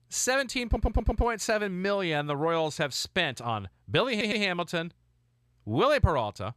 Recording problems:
audio stuttering; at 0.5 s and at 4 s

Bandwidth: 14 kHz